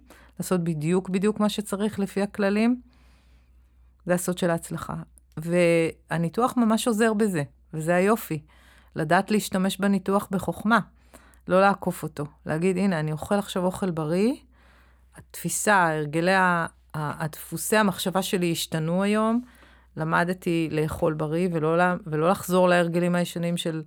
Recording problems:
none

